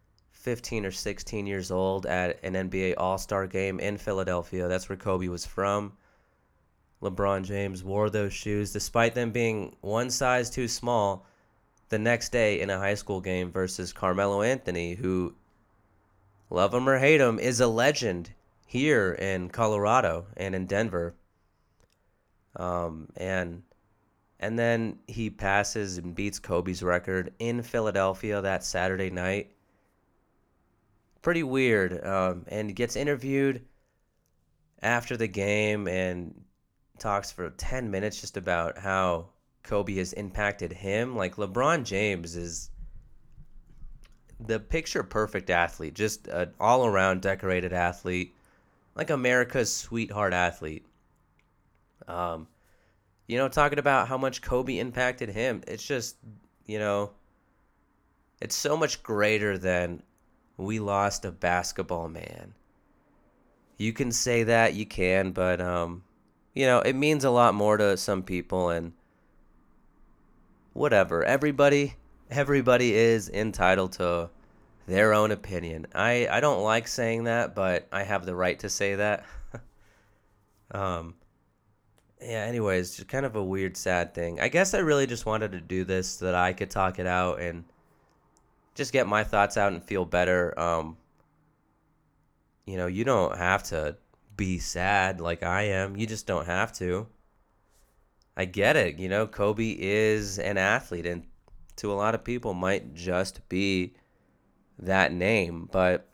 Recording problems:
none

